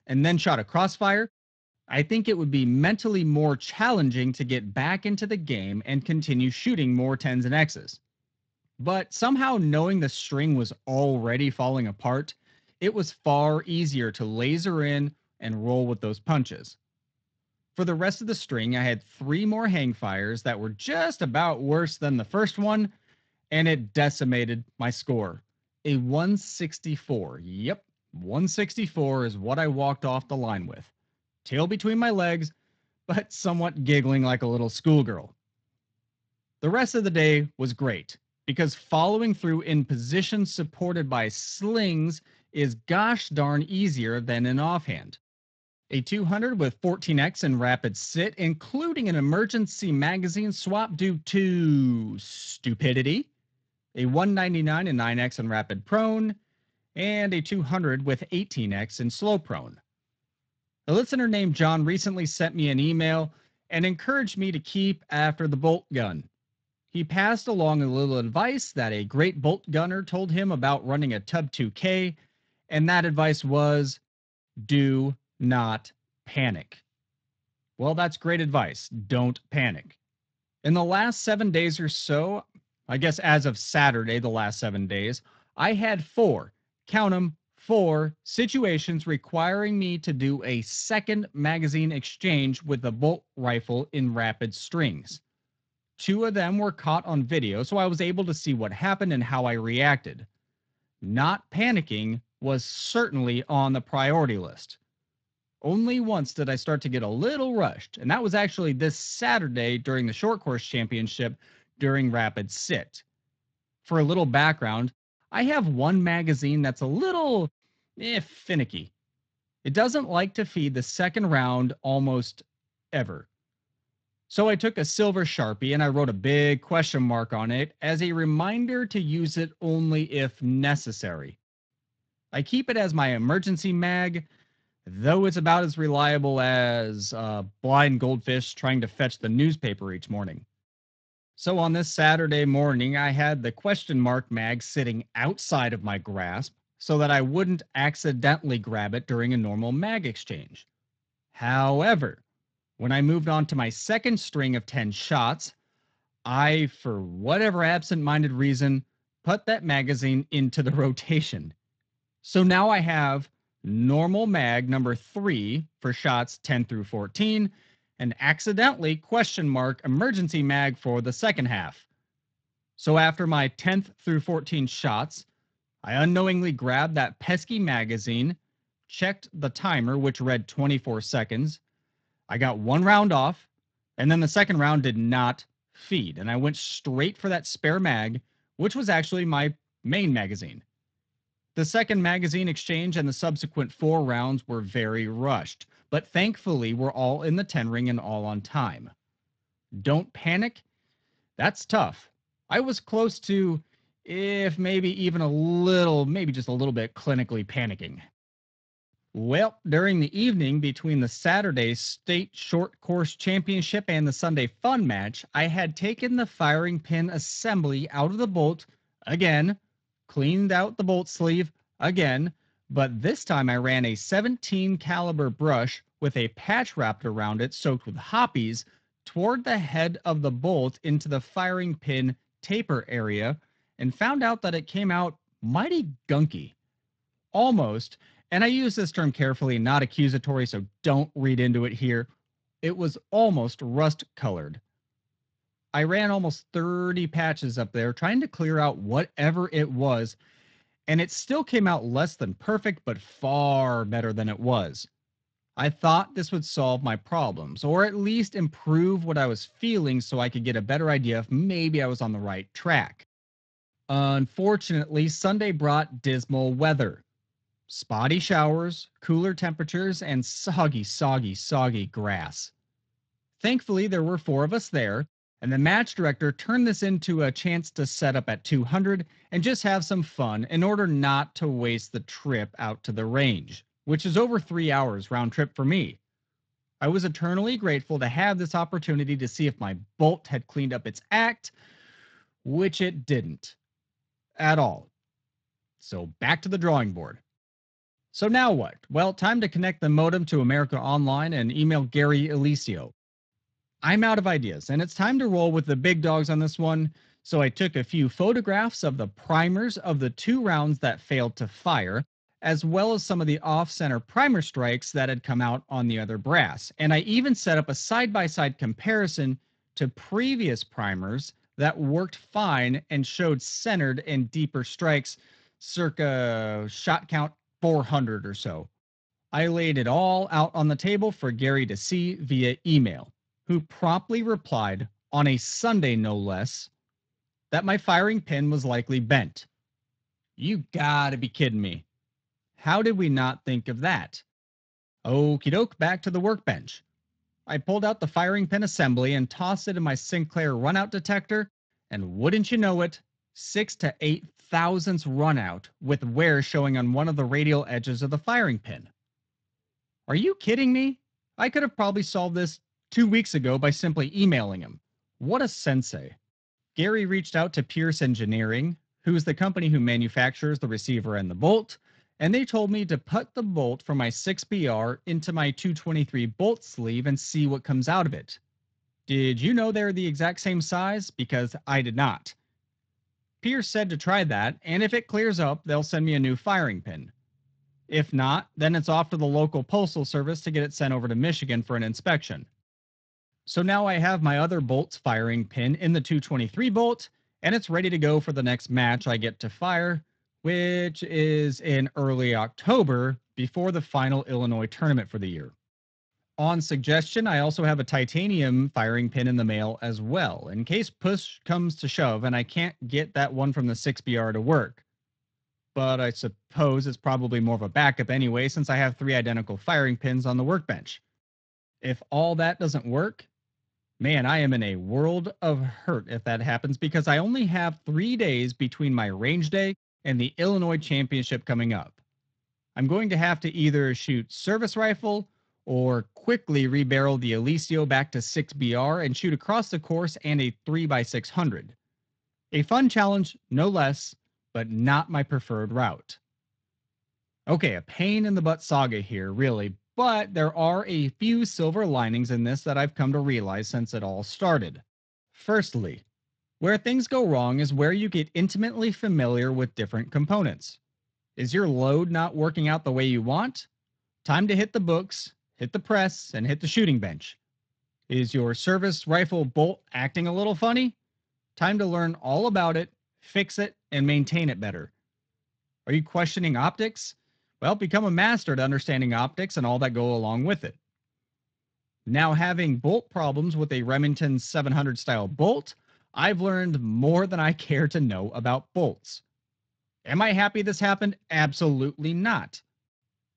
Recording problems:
garbled, watery; slightly

